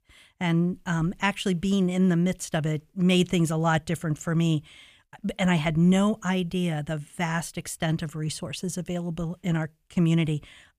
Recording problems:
none

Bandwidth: 15 kHz